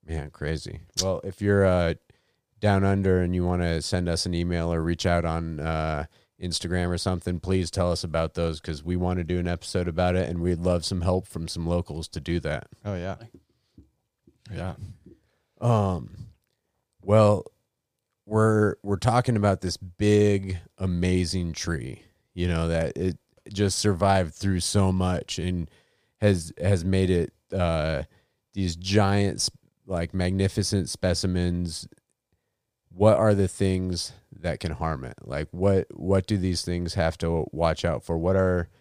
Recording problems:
none

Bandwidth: 15 kHz